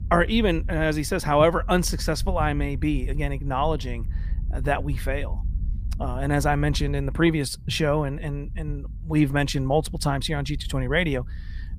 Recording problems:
low rumble; faint; throughout; 25 dB below the speech

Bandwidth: 15 kHz